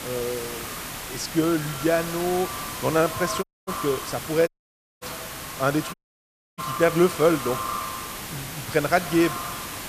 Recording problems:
echo of what is said; strong; throughout; 90 ms later, 10 dB below the speech
hiss; loud; throughout; 9 dB below the speech
audio cutting out; at 3.5 s, at 4.5 s for 0.5 s and at 6 s for 0.5 s

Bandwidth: 14.5 kHz